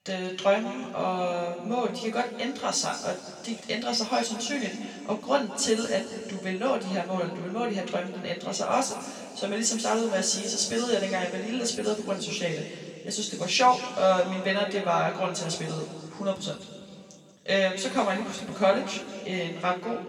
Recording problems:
off-mic speech; far
room echo; noticeable; dies away in 2.3 s

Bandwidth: 18.5 kHz